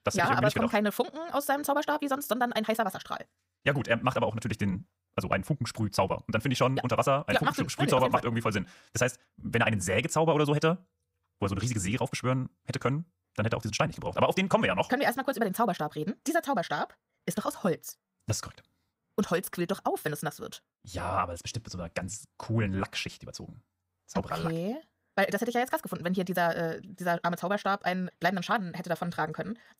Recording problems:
wrong speed, natural pitch; too fast; 1.8 times normal speed

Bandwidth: 15.5 kHz